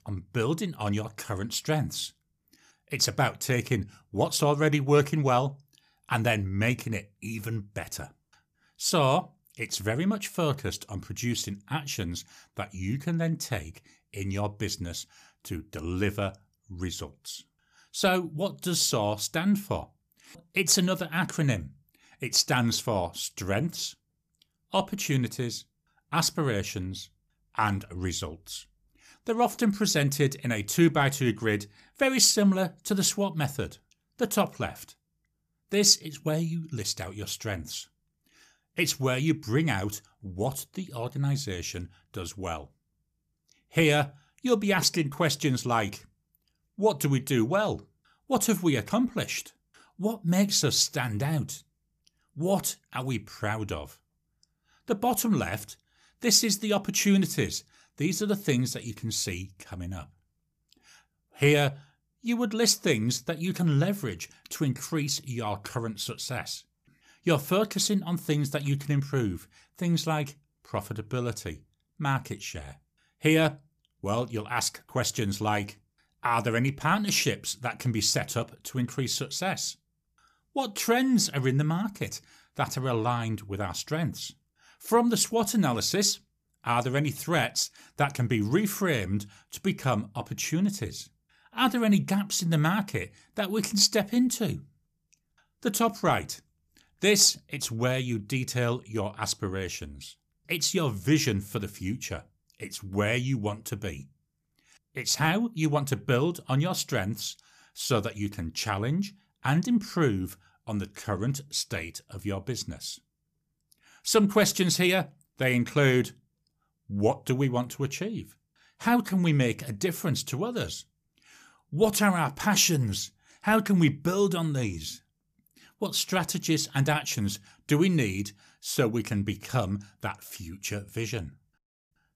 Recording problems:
none

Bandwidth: 14.5 kHz